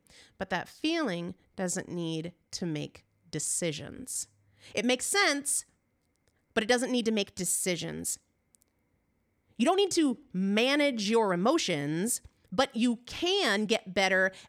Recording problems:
uneven, jittery; strongly; from 1 to 14 s

